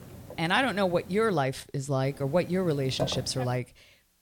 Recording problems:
hiss; noticeable; until 1.5 s and from 2 to 3.5 s; 15 dB below the speech

